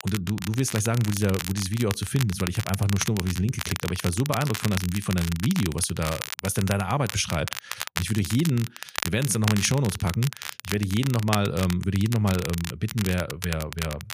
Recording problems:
crackle, like an old record; loud; 8 dB below the speech

